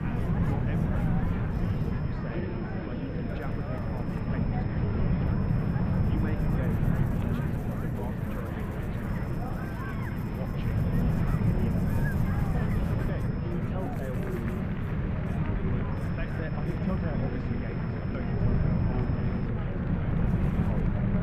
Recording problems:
muffled; very; fading above 2.5 kHz
chatter from many people; very loud; throughout; 4 dB above the speech
wind noise on the microphone; heavy; 5 dB above the speech
electrical hum; noticeable; throughout; 50 Hz, 15 dB below the speech
high-pitched whine; noticeable; from 1.5 to 6.5 s, from 9 to 14 s and from 16 to 19 s; 2.5 kHz, 20 dB below the speech

